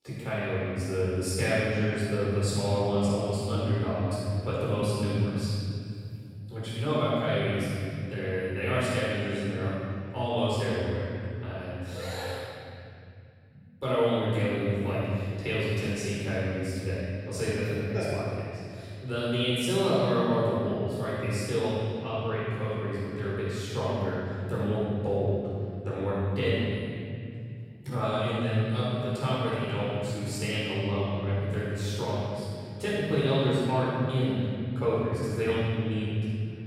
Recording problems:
room echo; strong; dies away in 3 s
off-mic speech; far

